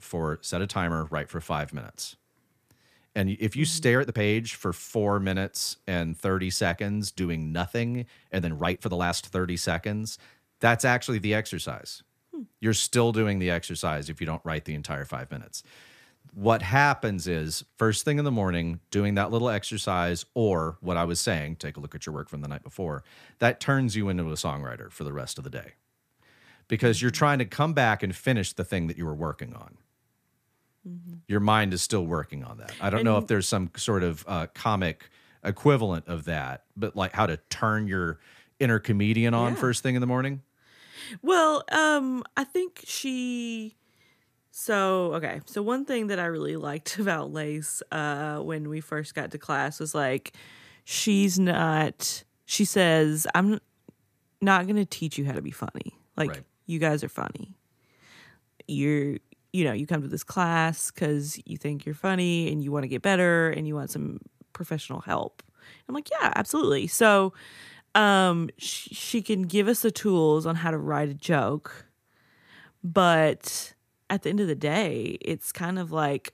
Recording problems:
uneven, jittery; strongly; from 4 s to 1:10

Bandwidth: 14.5 kHz